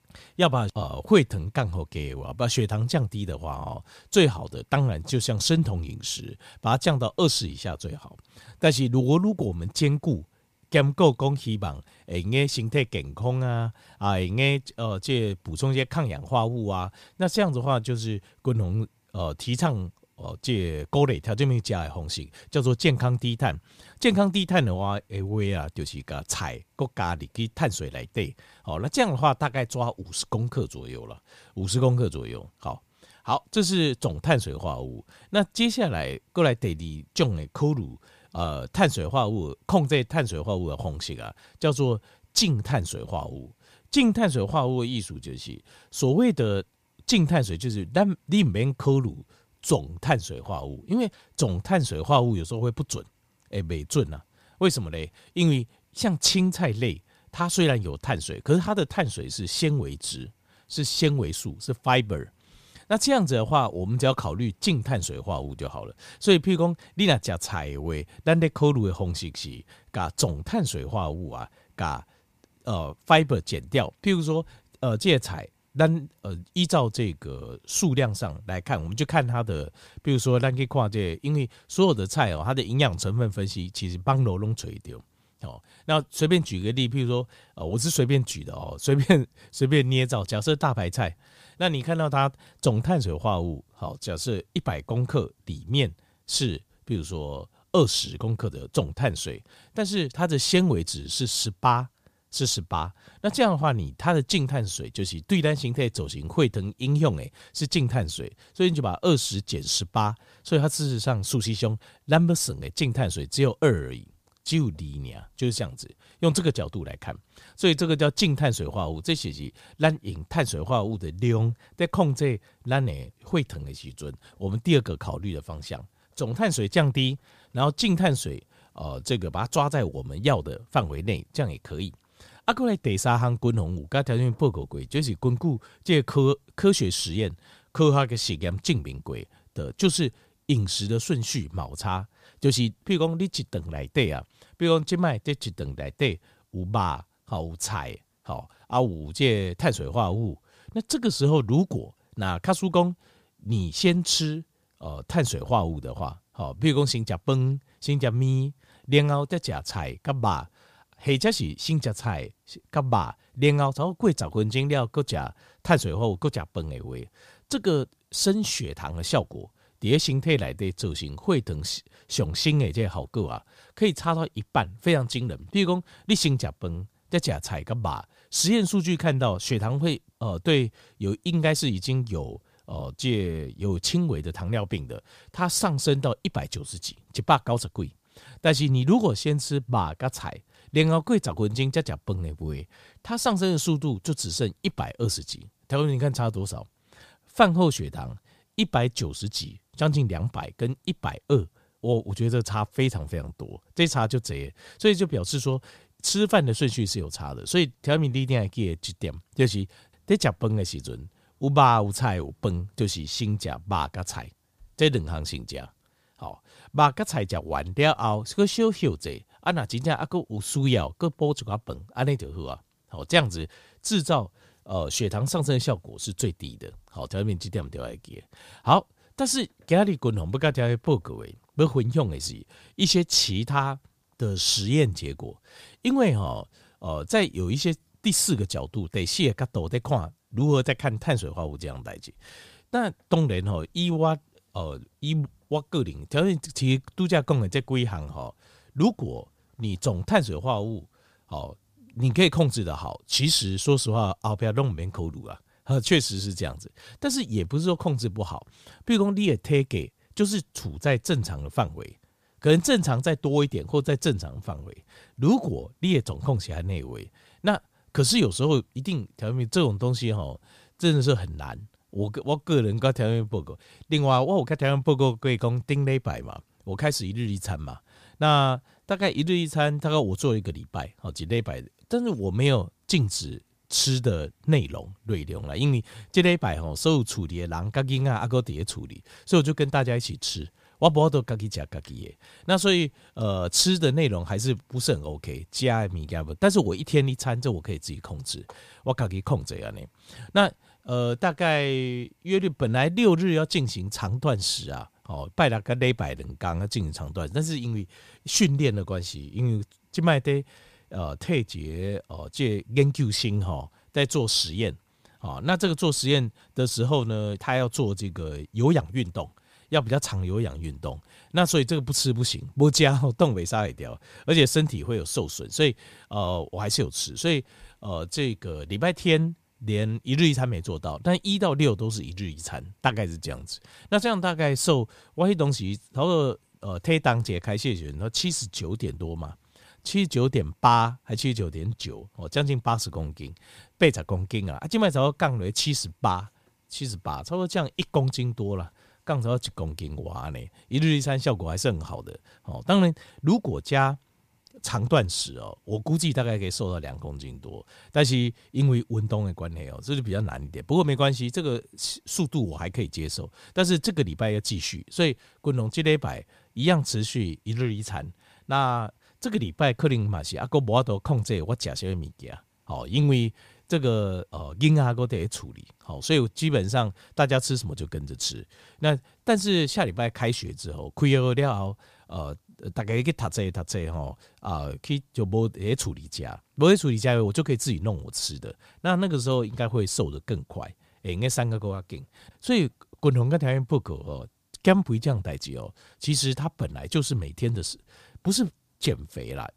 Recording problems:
none

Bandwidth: 15 kHz